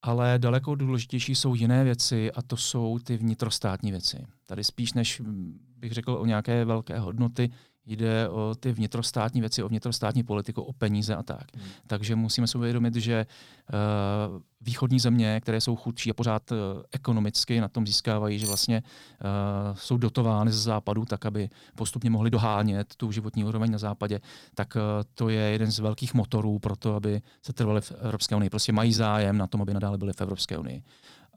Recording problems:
uneven, jittery; strongly; from 5 to 30 s
clattering dishes; noticeable; at 18 s; peak 3 dB below the speech

